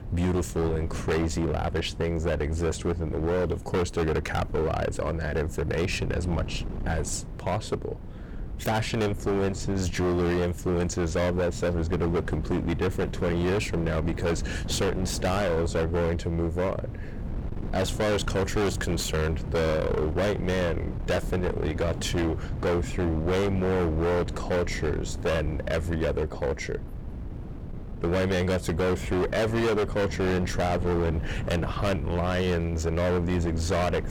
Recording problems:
distortion; heavy; 24% of the sound clipped
wind noise on the microphone; occasional gusts; 15 dB below the speech

